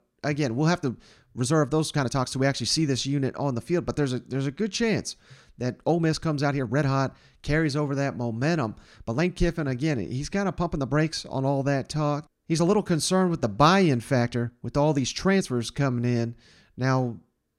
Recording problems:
uneven, jittery; strongly; from 0.5 to 16 s

